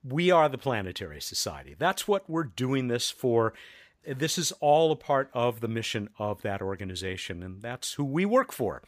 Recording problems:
none

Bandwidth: 15 kHz